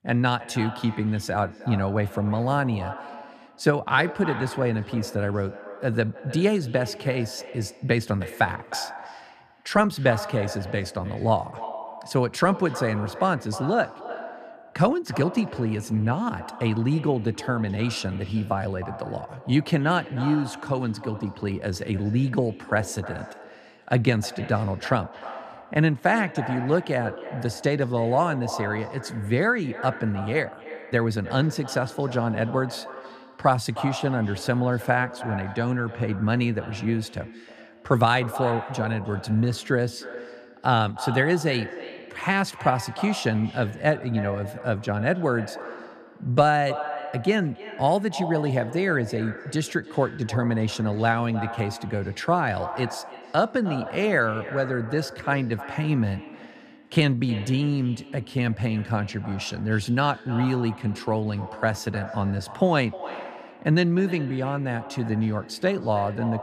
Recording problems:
echo of what is said; noticeable; throughout; 310 ms later, 15 dB below the speech

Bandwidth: 14.5 kHz